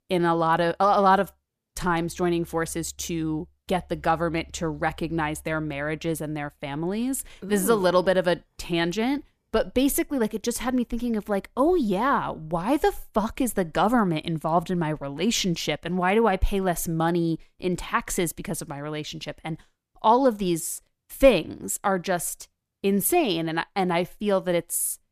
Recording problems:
none

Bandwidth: 14.5 kHz